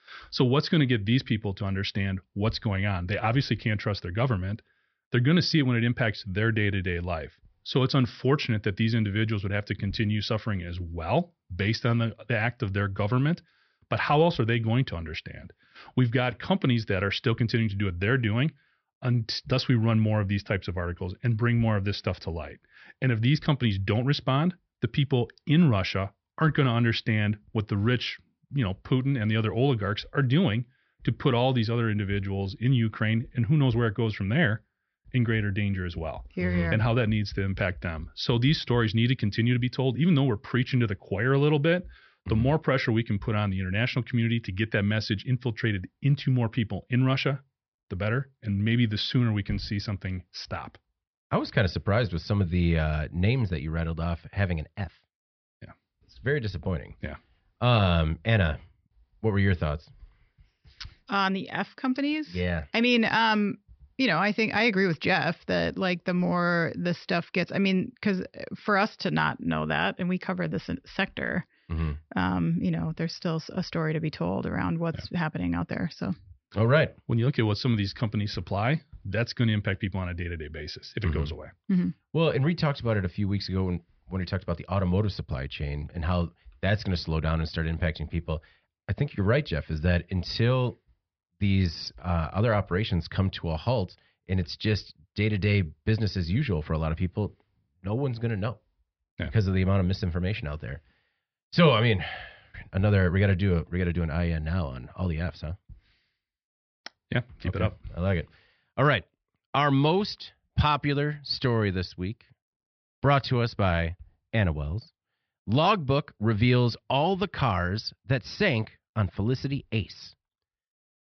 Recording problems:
high frequencies cut off; noticeable; nothing above 5.5 kHz

